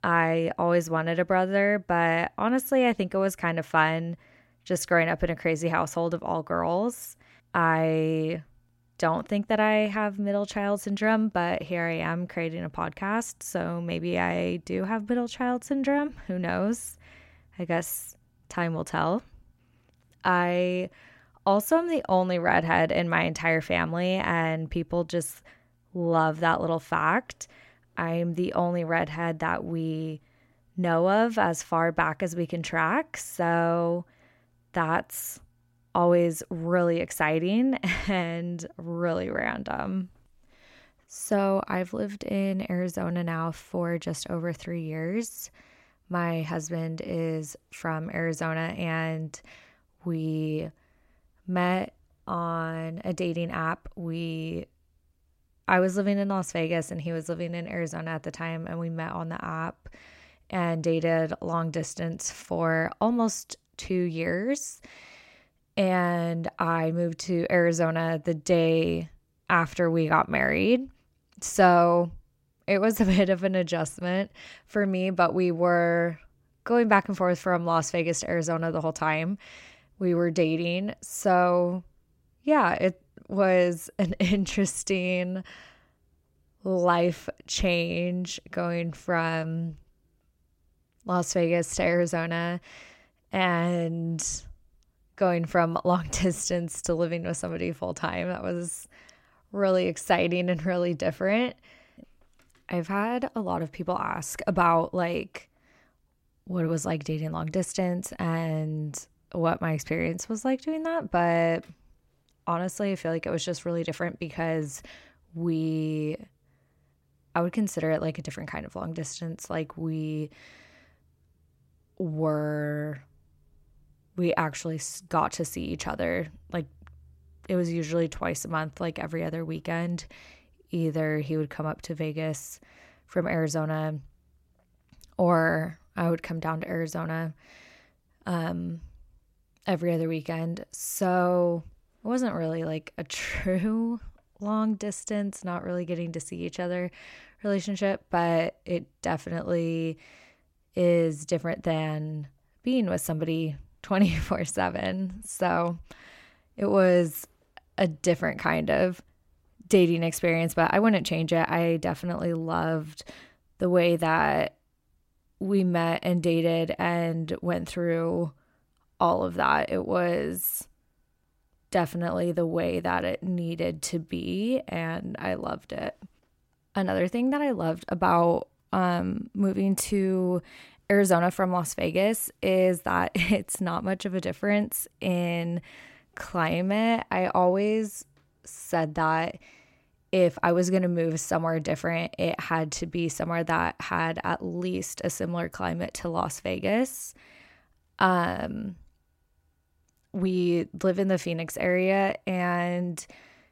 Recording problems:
none

